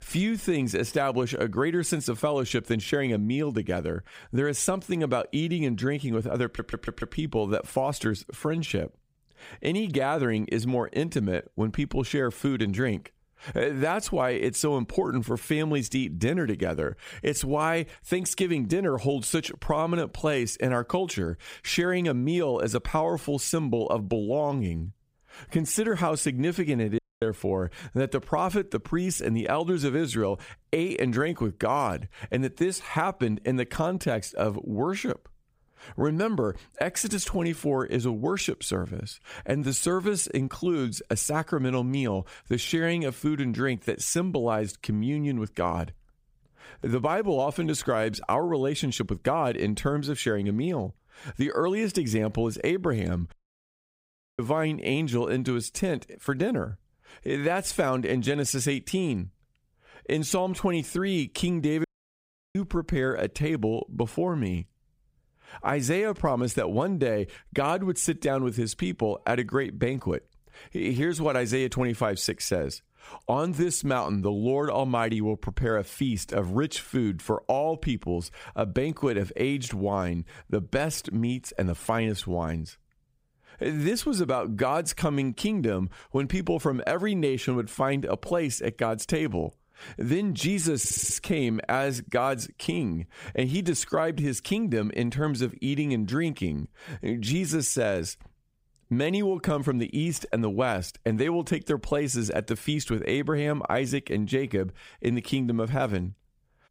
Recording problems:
squashed, flat; somewhat
audio stuttering; at 6.5 s and at 1:31
audio cutting out; at 27 s, at 53 s for 1 s and at 1:02 for 0.5 s

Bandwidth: 15.5 kHz